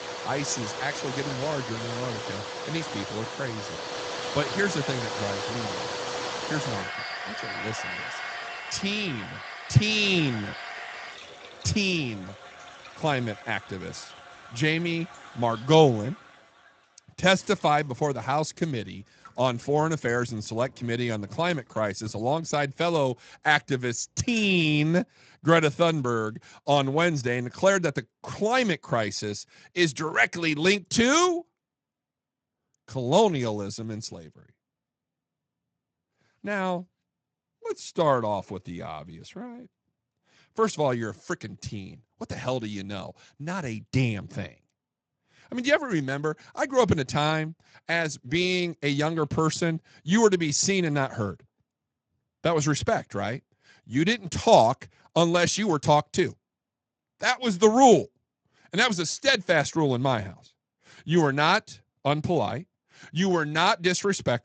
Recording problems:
garbled, watery; slightly; nothing above 7.5 kHz
household noises; loud; until 24 s; 10 dB below the speech

